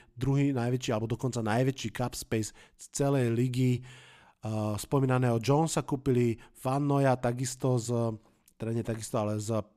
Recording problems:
none

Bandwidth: 14.5 kHz